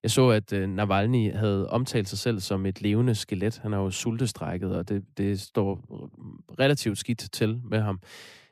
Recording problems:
none

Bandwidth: 14.5 kHz